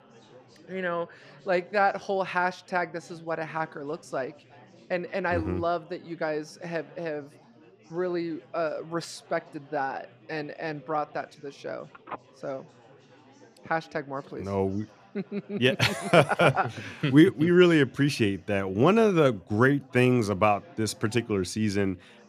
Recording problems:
chatter from many people; faint; throughout; 25 dB below the speech
phone ringing; faint; from 12 to 14 s; peak 15 dB below the speech

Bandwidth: 14.5 kHz